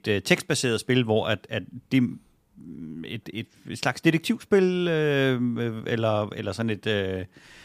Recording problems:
none

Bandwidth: 15 kHz